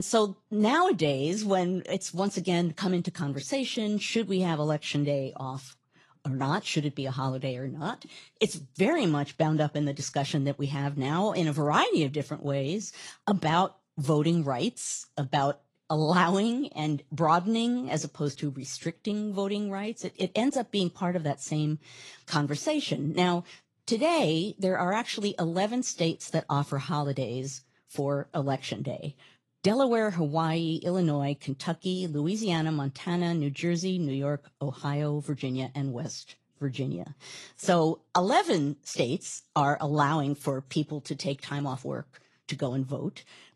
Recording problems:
garbled, watery; slightly; nothing above 11 kHz
abrupt cut into speech; at the start

